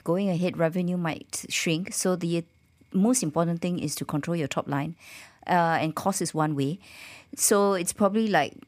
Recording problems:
none

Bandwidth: 15 kHz